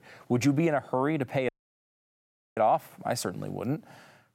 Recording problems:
audio cutting out; at 1.5 s for 1 s

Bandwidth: 16 kHz